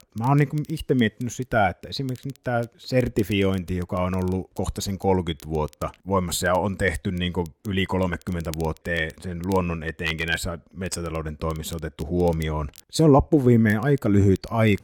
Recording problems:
crackle, like an old record; faint; 25 dB below the speech

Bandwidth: 17 kHz